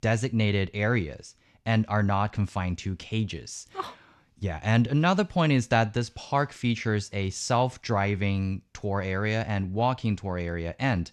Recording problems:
none

